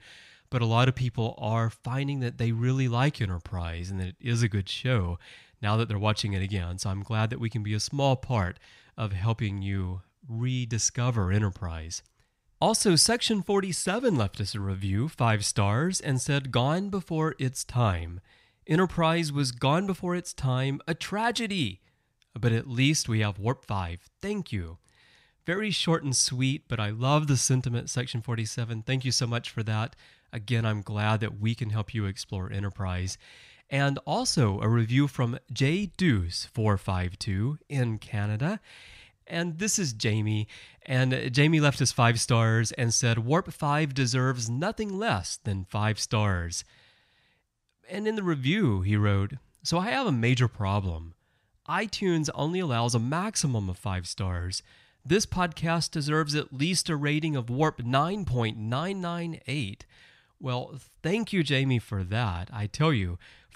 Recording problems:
none

